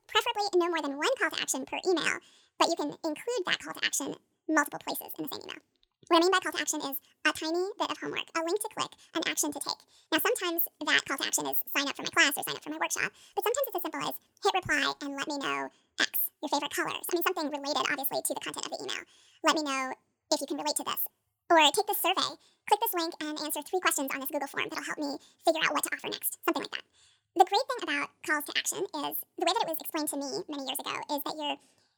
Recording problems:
wrong speed and pitch; too fast and too high; 1.7 times normal speed

